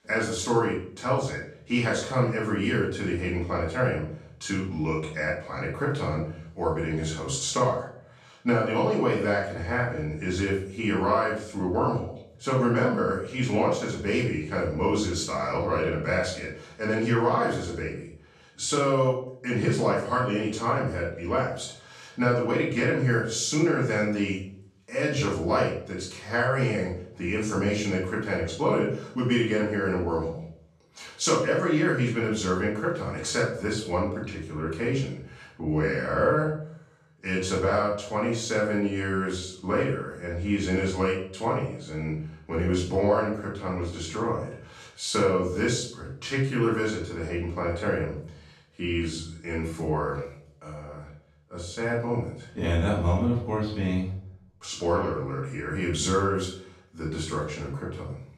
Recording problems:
off-mic speech; far
room echo; noticeable; dies away in 0.5 s

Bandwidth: 14.5 kHz